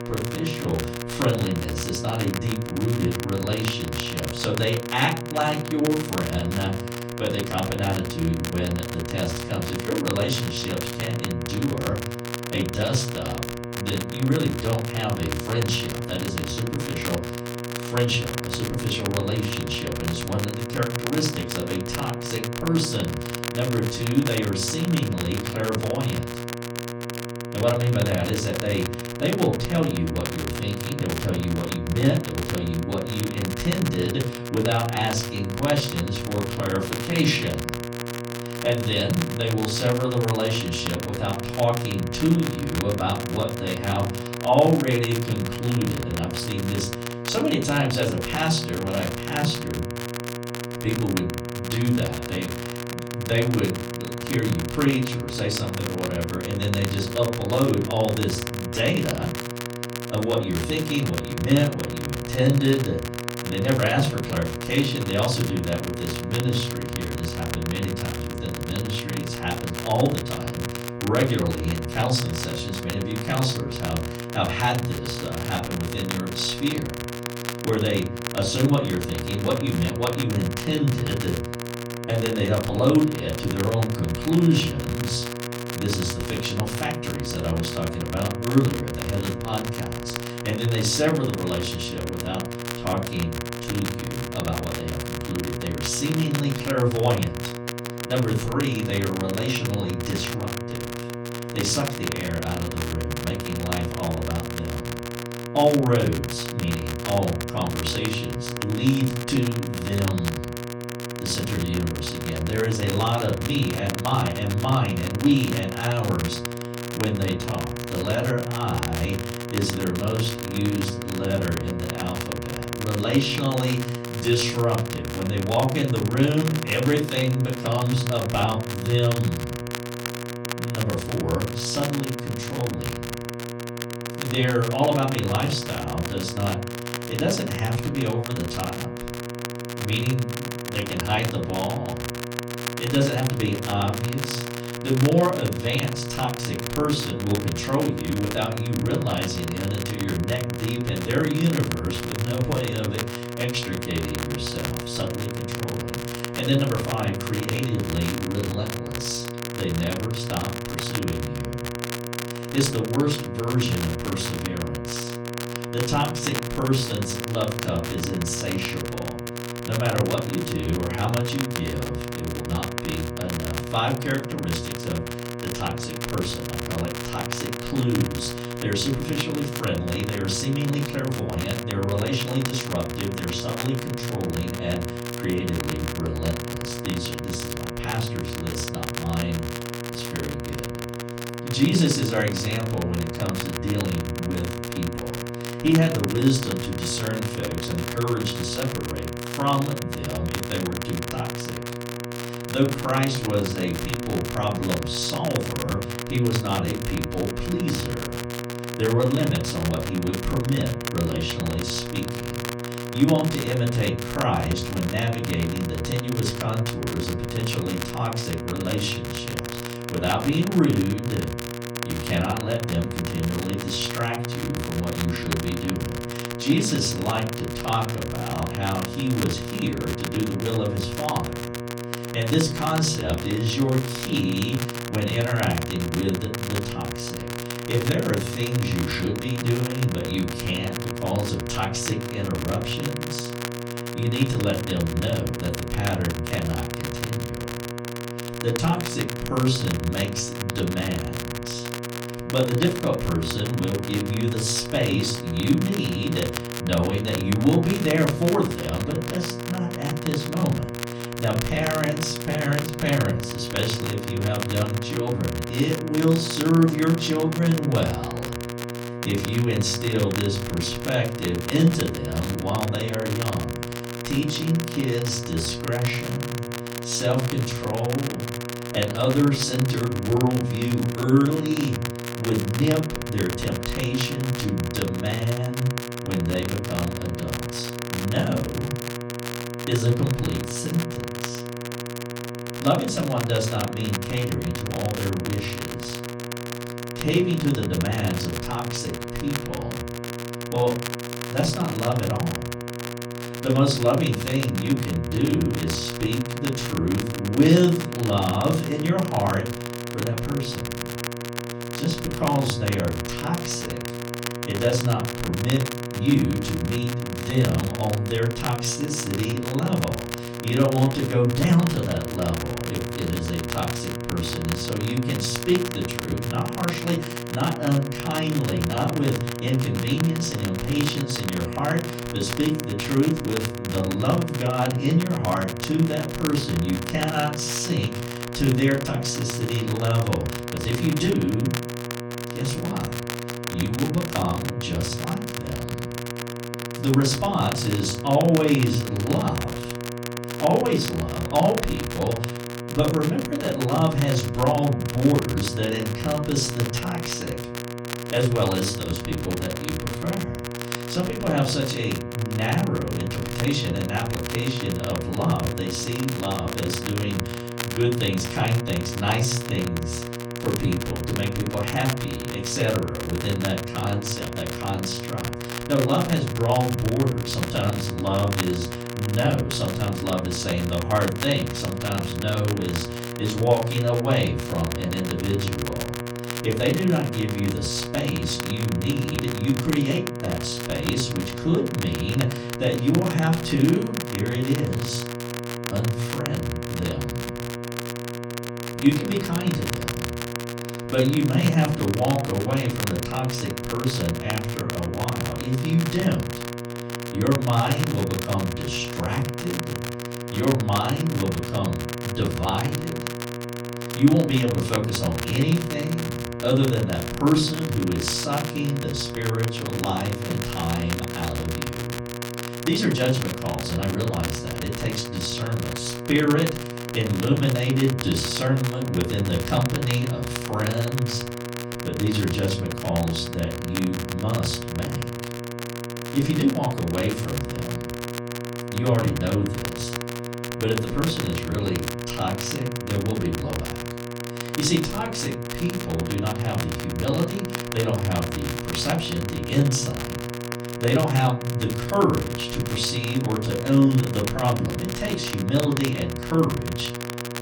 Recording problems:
off-mic speech; far
room echo; very slight; dies away in 0.4 s
electrical hum; loud; throughout; 60 Hz, 8 dB below the speech
crackle, like an old record; loud; 10 dB below the speech

